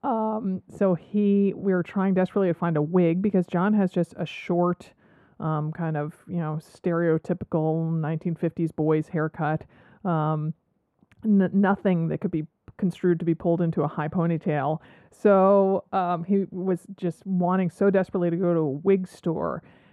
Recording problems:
muffled; very; fading above 1.5 kHz

